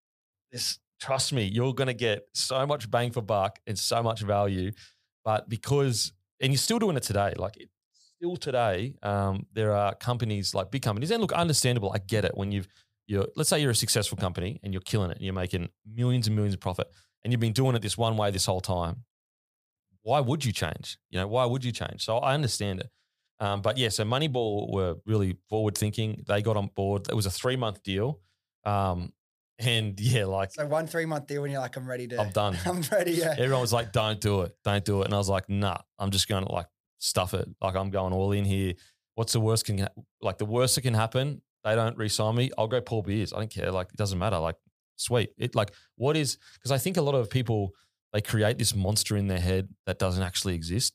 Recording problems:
none

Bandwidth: 15 kHz